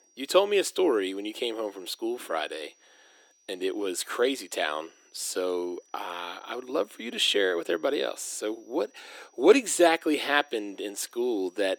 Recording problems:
thin; somewhat; fading below 300 Hz
high-pitched whine; faint; throughout; 6 kHz, 35 dB below the speech

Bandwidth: 18 kHz